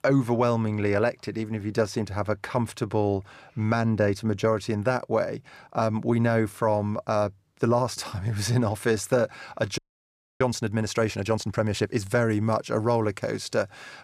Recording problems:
audio freezing; at 10 s for 0.5 s

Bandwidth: 15 kHz